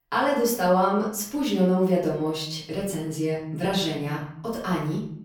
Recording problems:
off-mic speech; far
room echo; noticeable; dies away in 0.7 s

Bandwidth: 17.5 kHz